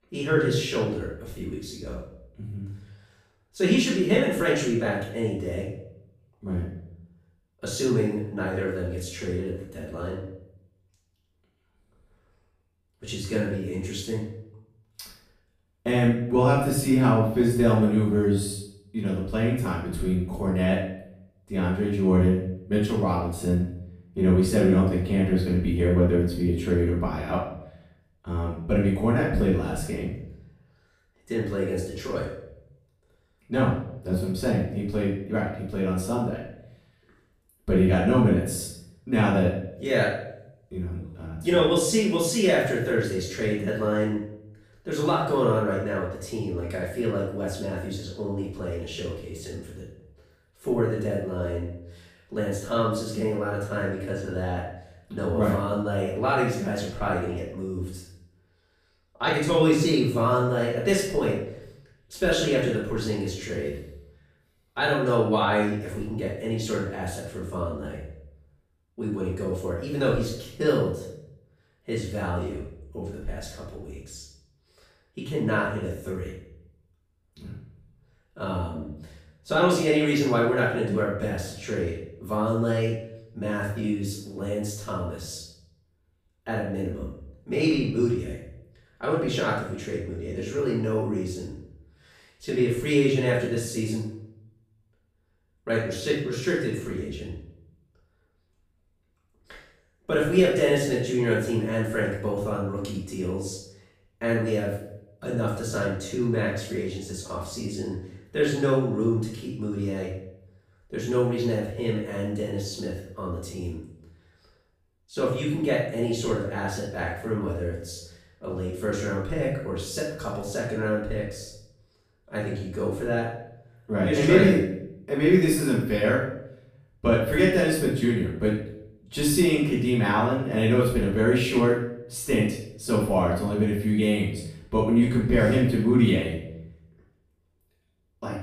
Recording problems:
off-mic speech; far
room echo; noticeable; dies away in 0.6 s

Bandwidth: 15 kHz